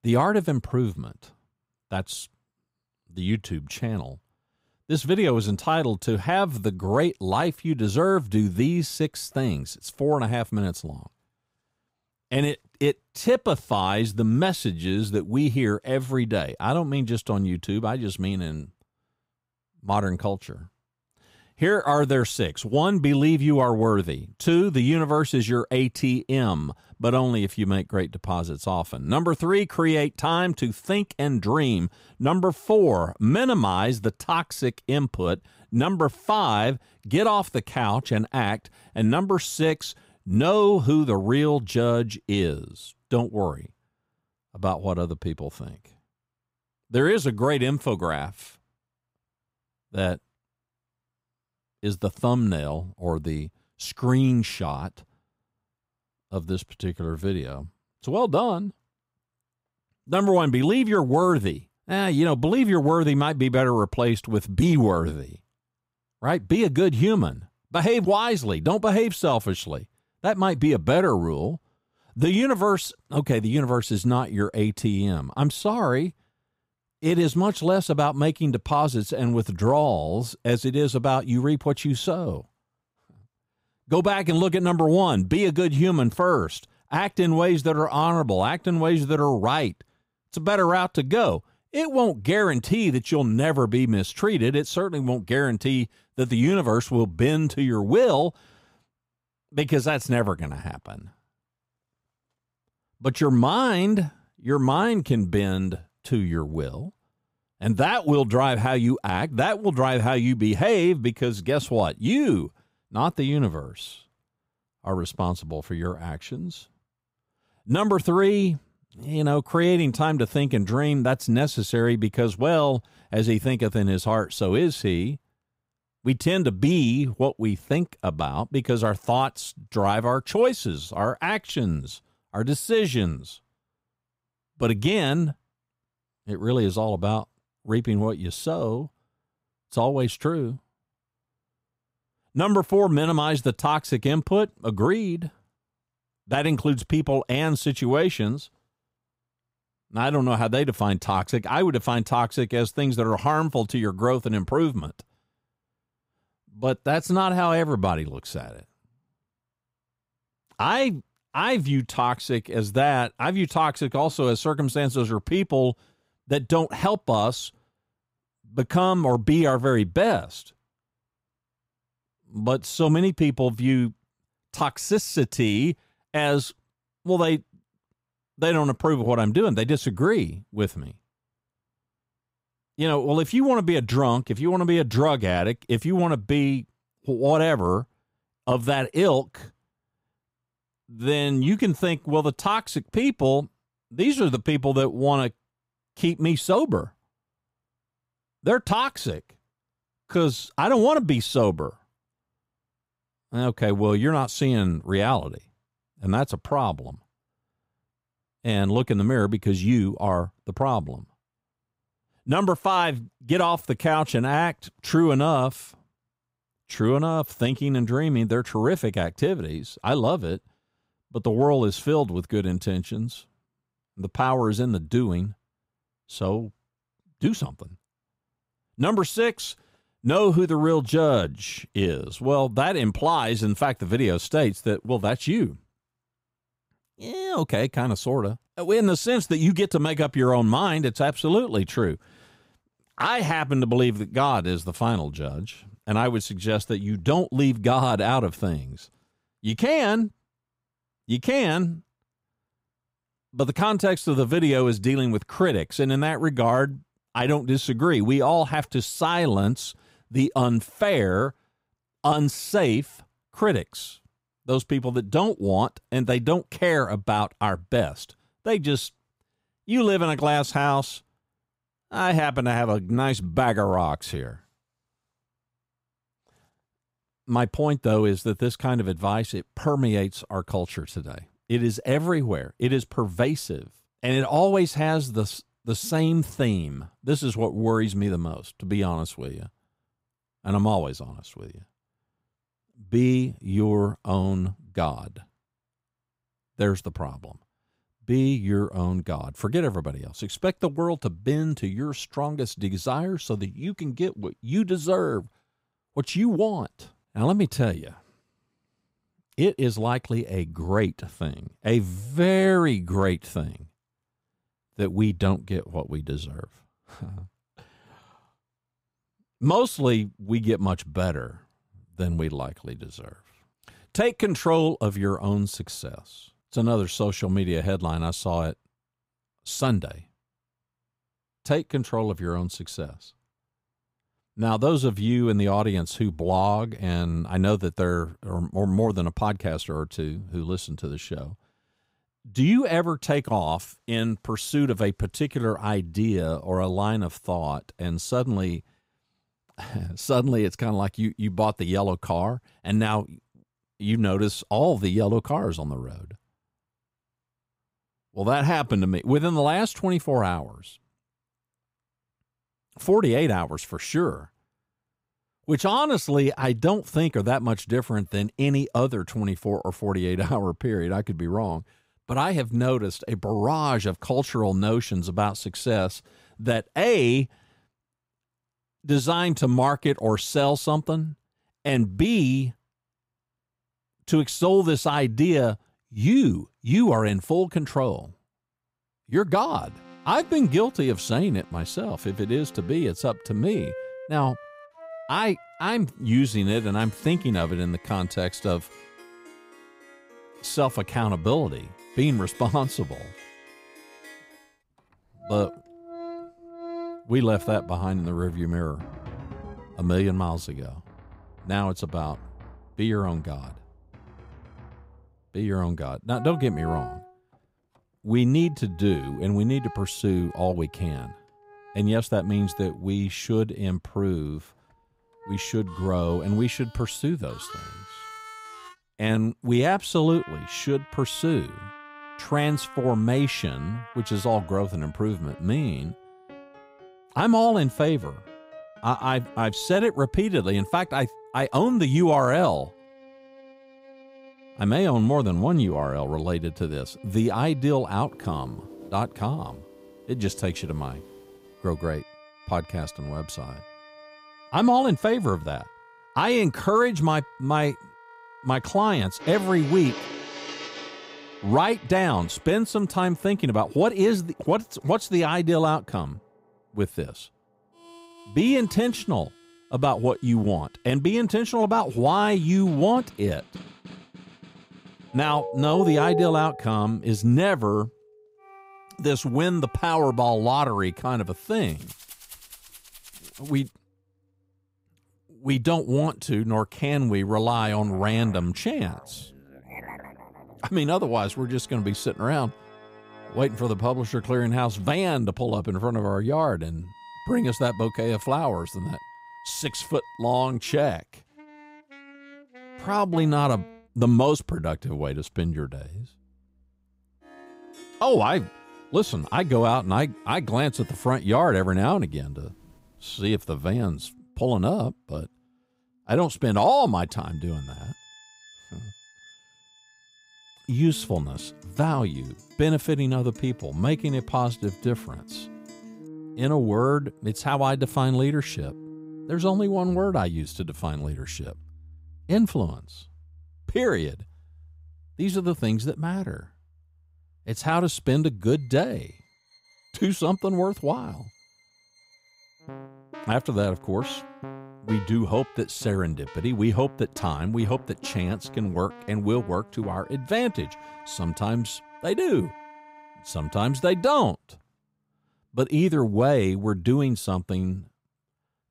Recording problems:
background music; noticeable; from 6:29 on; 20 dB below the speech

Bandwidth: 15.5 kHz